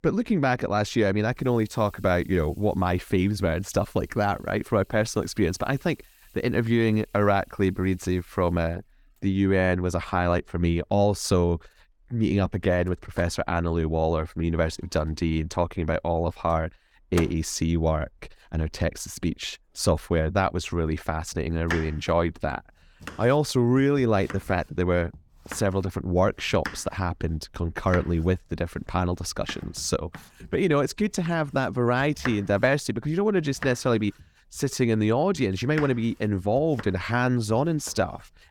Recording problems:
household noises; noticeable; throughout; 15 dB below the speech

